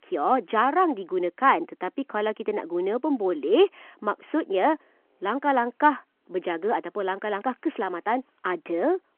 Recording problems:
phone-call audio

